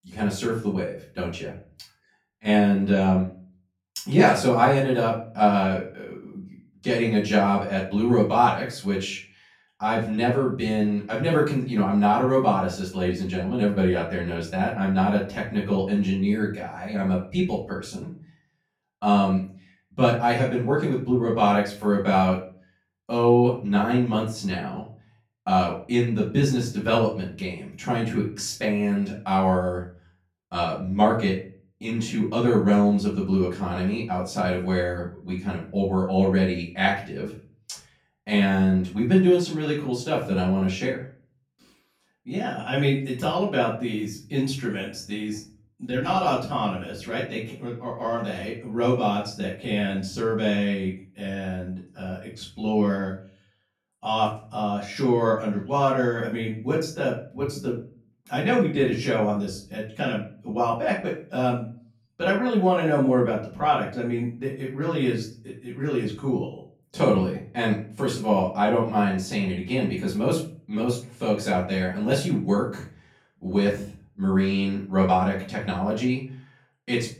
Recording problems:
off-mic speech; far
room echo; slight; dies away in 0.3 s

